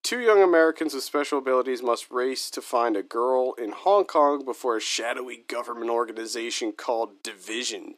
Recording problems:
thin; somewhat; fading below 300 Hz

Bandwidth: 14.5 kHz